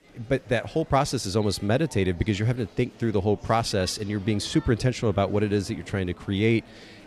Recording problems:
murmuring crowd; faint; throughout; 20 dB below the speech

